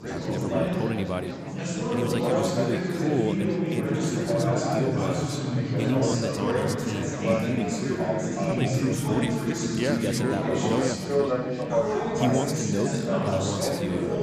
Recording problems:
chatter from many people; very loud; throughout; 4 dB above the speech

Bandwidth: 14.5 kHz